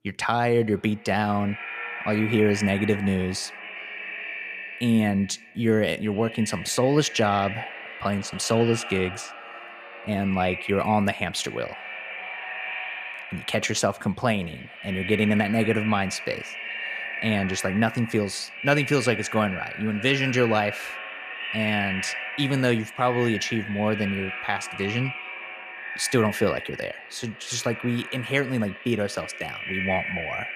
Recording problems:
echo of what is said; strong; throughout; 410 ms later, 8 dB below the speech

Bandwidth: 14.5 kHz